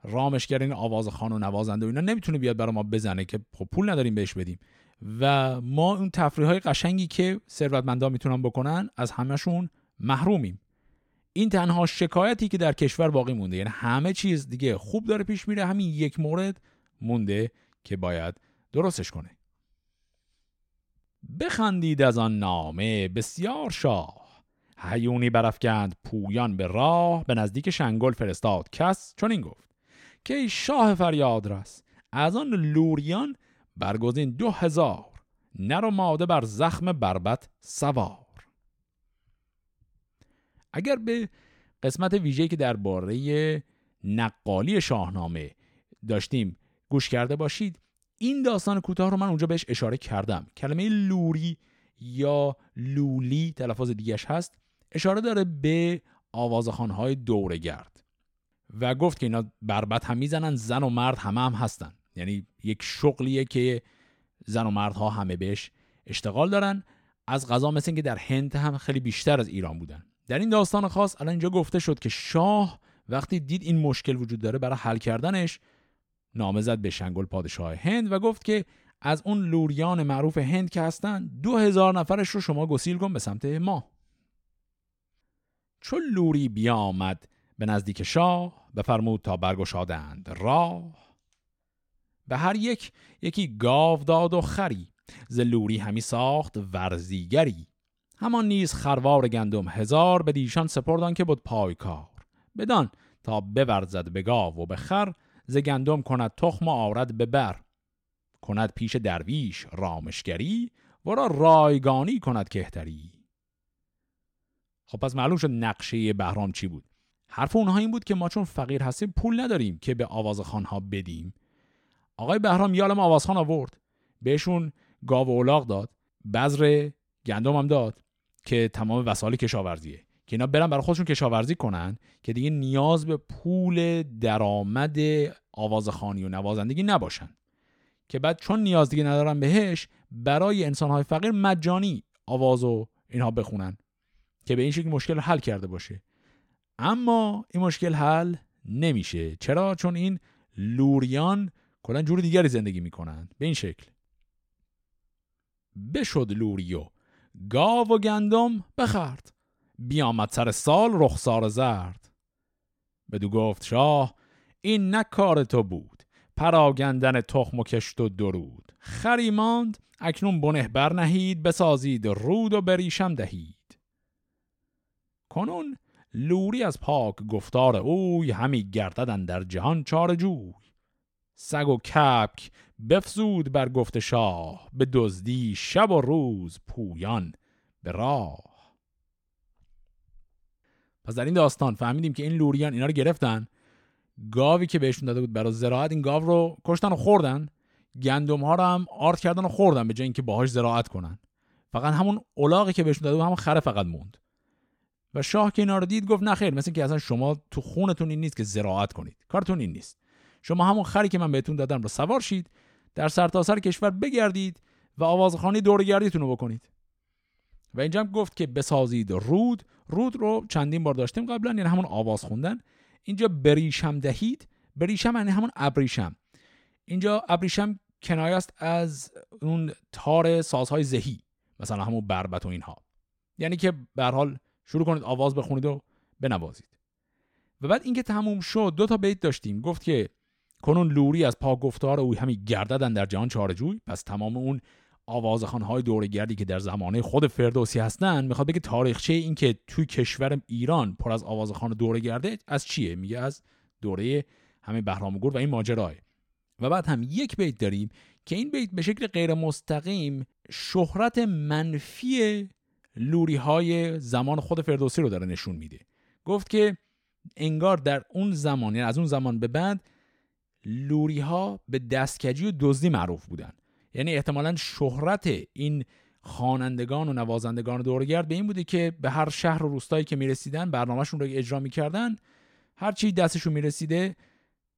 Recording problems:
none

